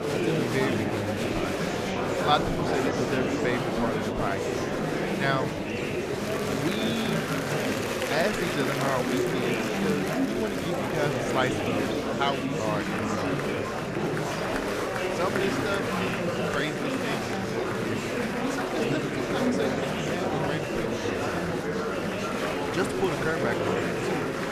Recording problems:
murmuring crowd; very loud; throughout; 4 dB above the speech

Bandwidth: 14.5 kHz